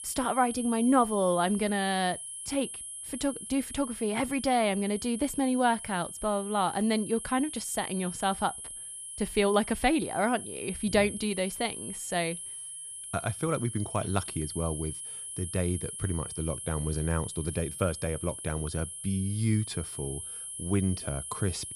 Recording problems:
high-pitched whine; loud; throughout; 10.5 kHz, 8 dB below the speech

